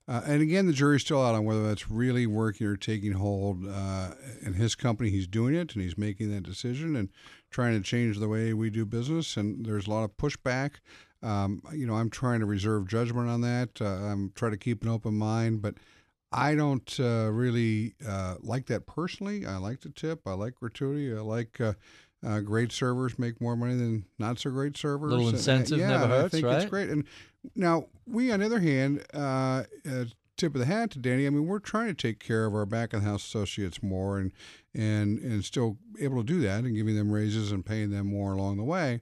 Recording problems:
none

